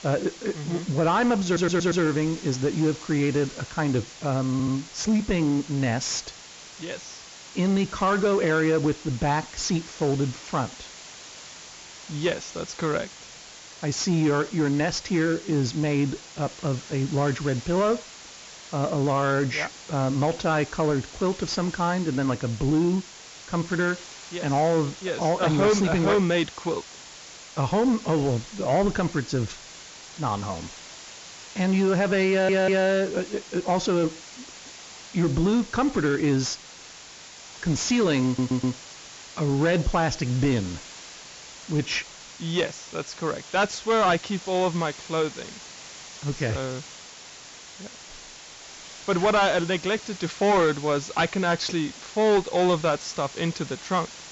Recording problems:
high frequencies cut off; noticeable; nothing above 7.5 kHz
distortion; slight; 10 dB below the speech
hiss; noticeable; throughout; 15 dB below the speech
audio stuttering; 4 times, first at 1.5 s

